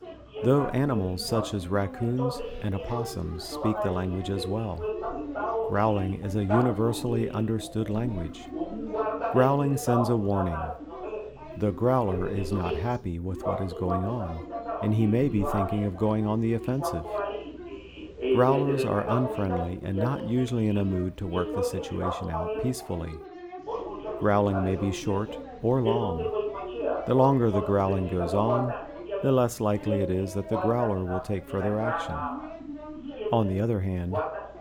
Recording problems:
background chatter; loud; throughout; 2 voices, 6 dB below the speech

